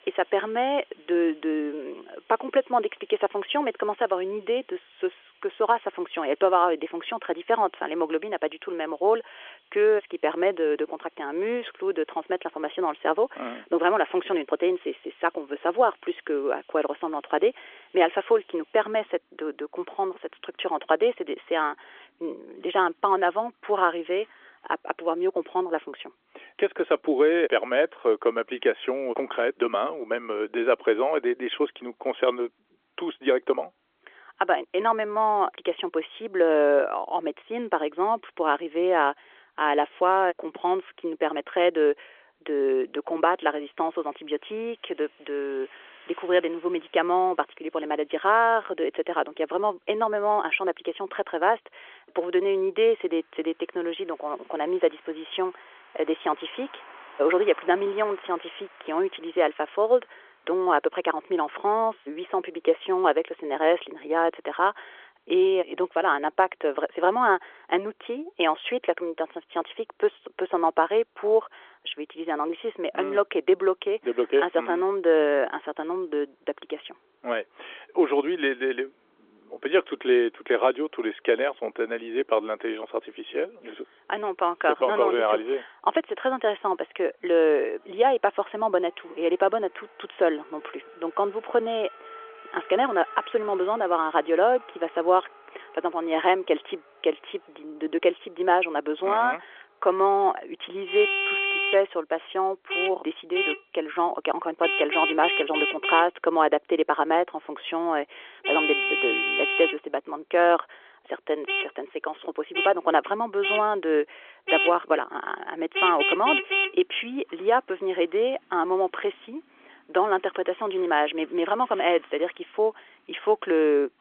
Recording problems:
phone-call audio; nothing above 3.5 kHz
traffic noise; loud; throughout; 2 dB below the speech

